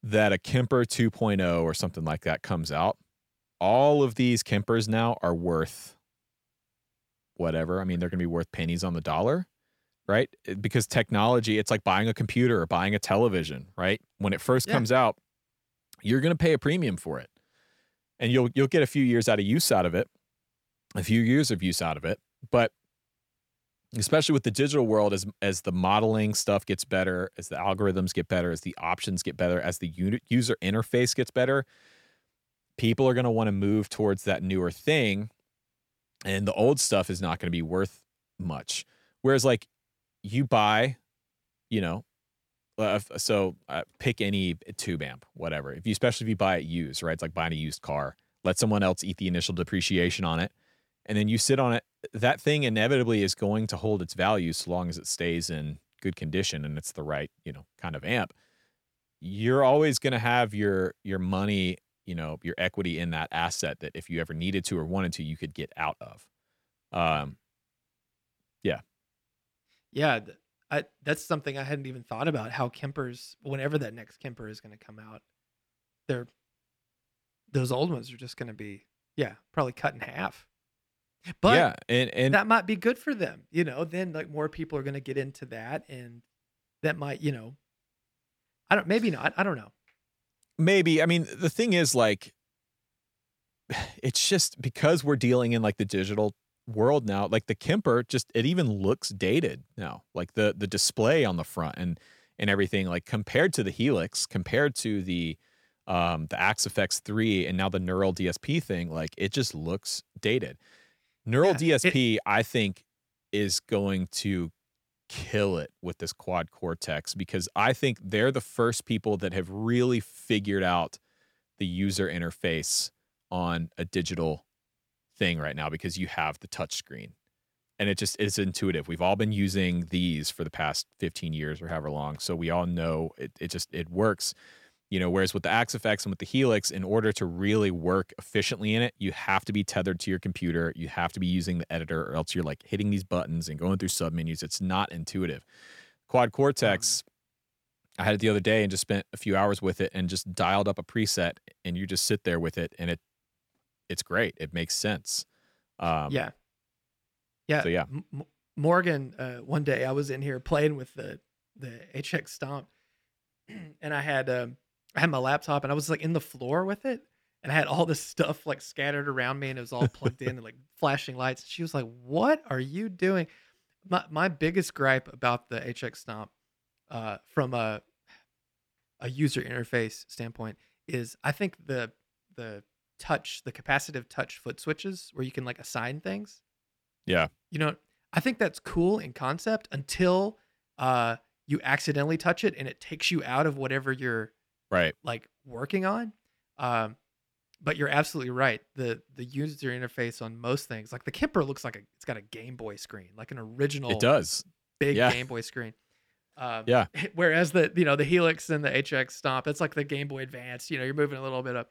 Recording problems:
none

